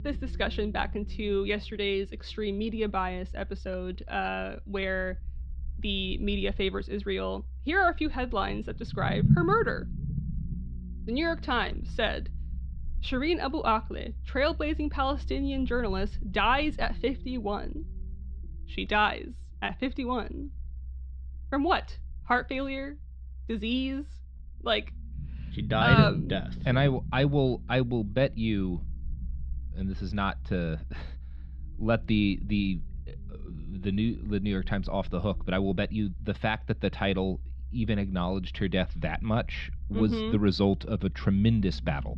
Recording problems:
muffled; very slightly; fading above 4 kHz
low rumble; noticeable; throughout; 15 dB below the speech

